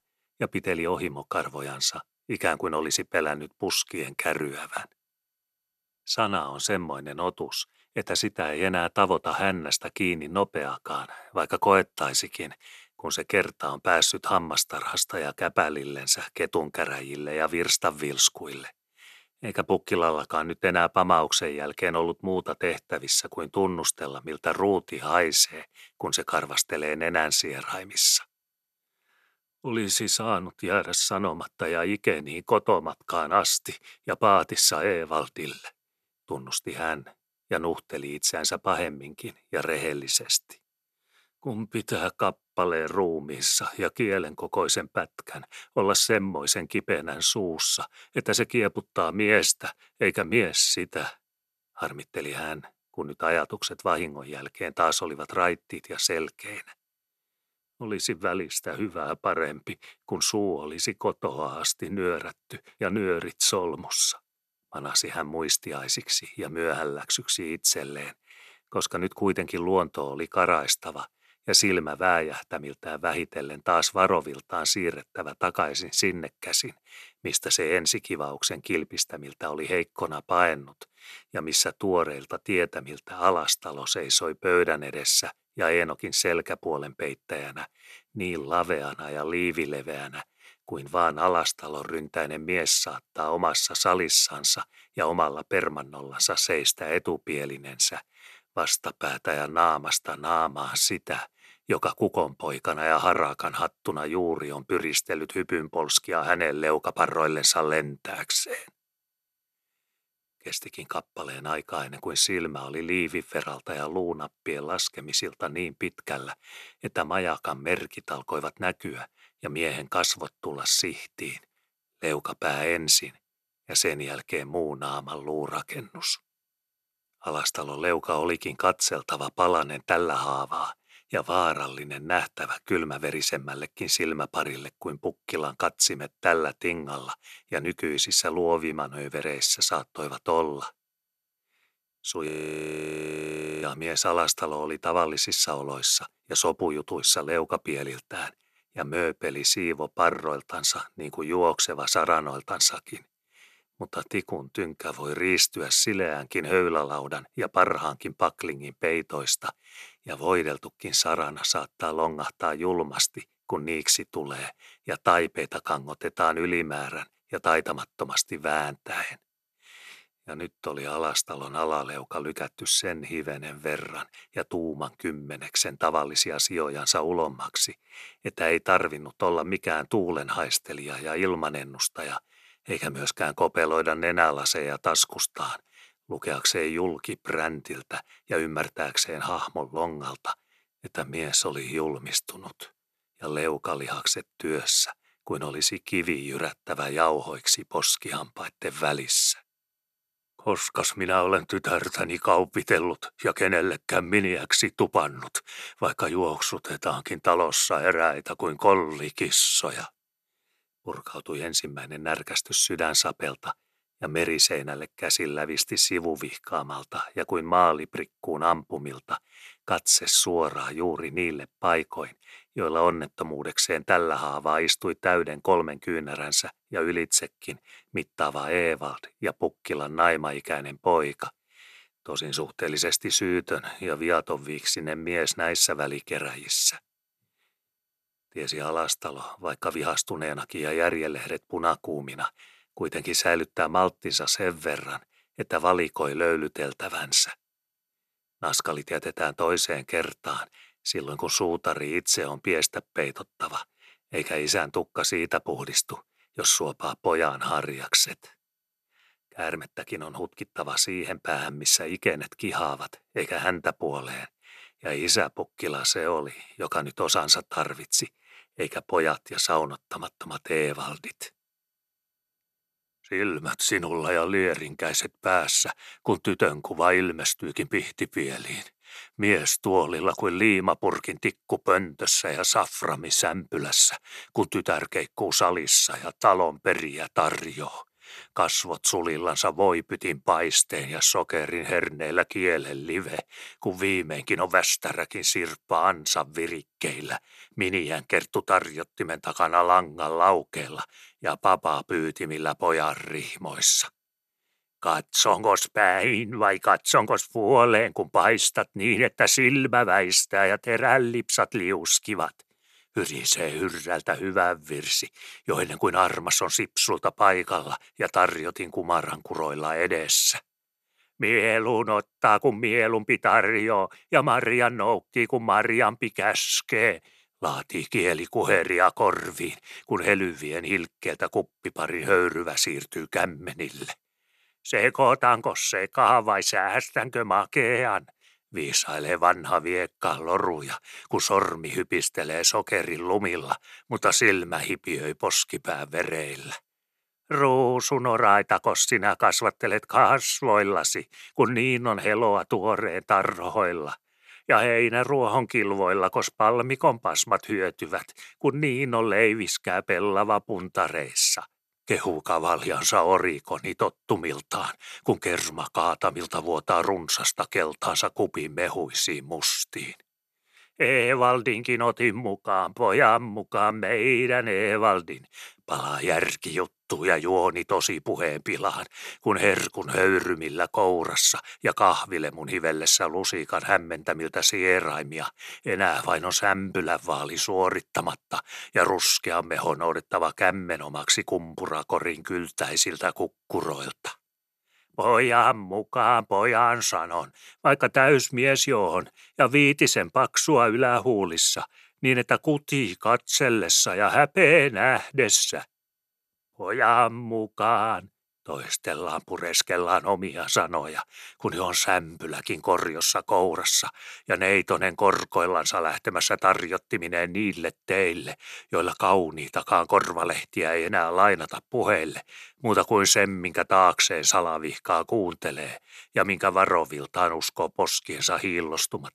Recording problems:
audio freezing; at 2:22 for 1.5 s

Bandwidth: 13.5 kHz